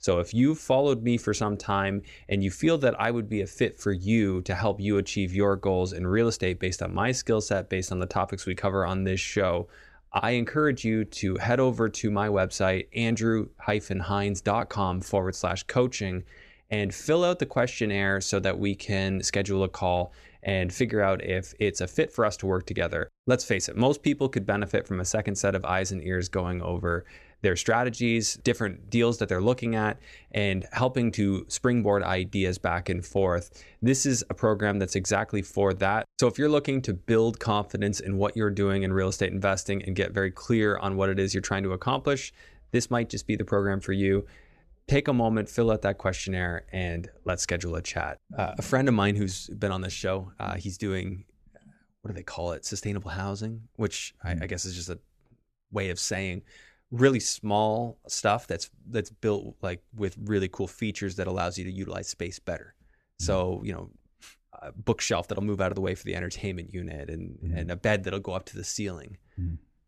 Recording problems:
none

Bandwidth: 14 kHz